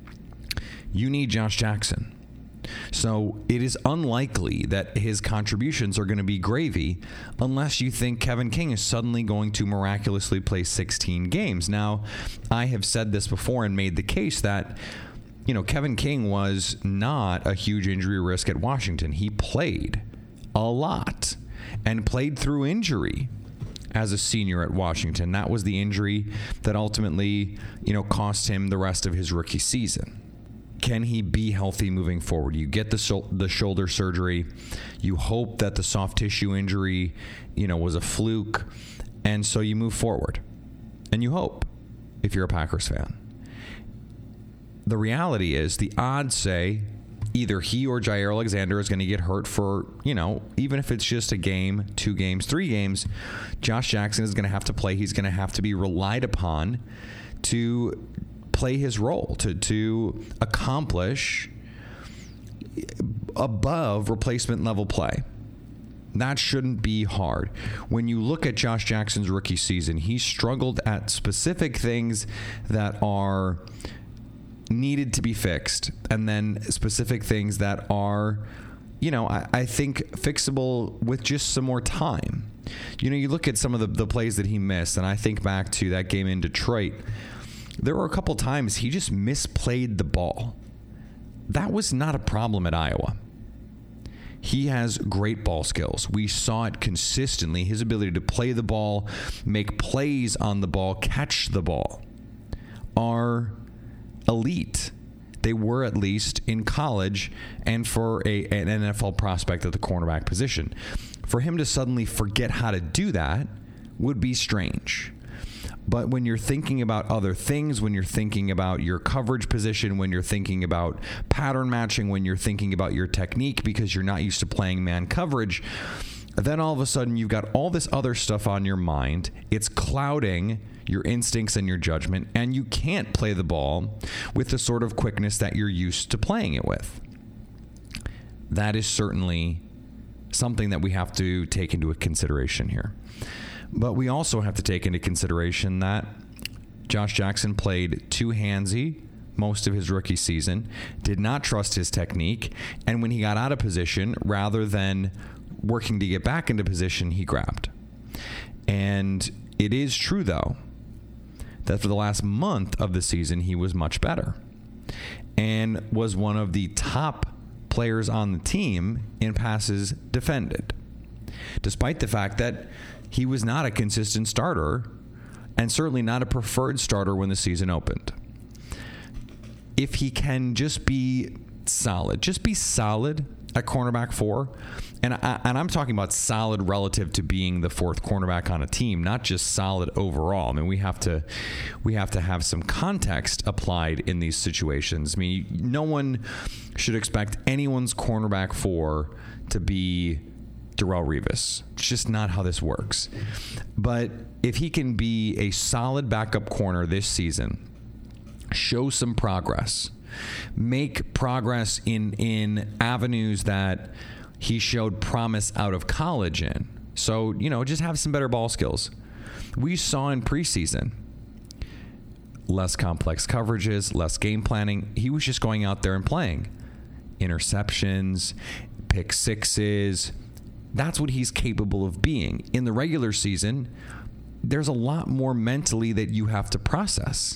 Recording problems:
squashed, flat; heavily

